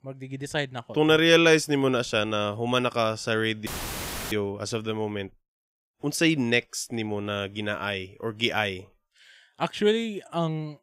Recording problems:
audio cutting out; filled with static; at 3.5 s for 0.5 s

